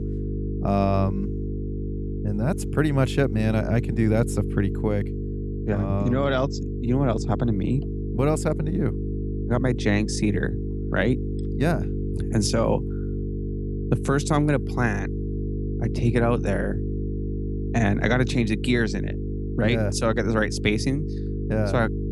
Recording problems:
electrical hum; loud; throughout; 50 Hz, 10 dB below the speech

